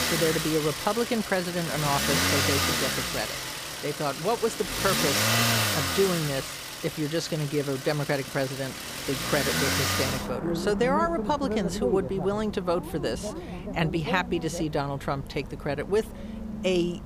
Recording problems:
traffic noise; very loud; throughout; as loud as the speech

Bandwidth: 15 kHz